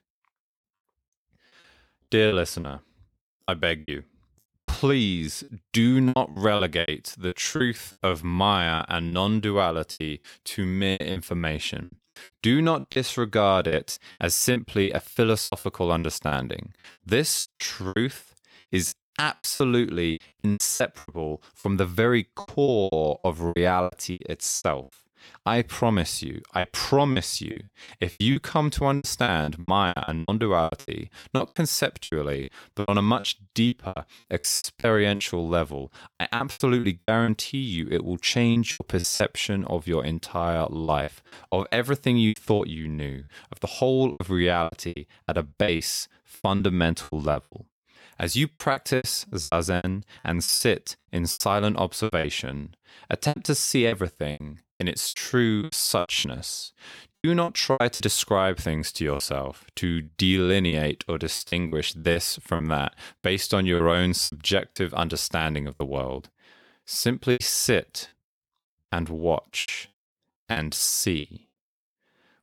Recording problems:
choppy; very; 14% of the speech affected

